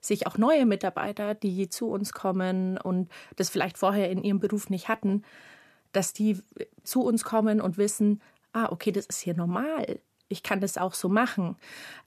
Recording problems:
none

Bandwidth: 14.5 kHz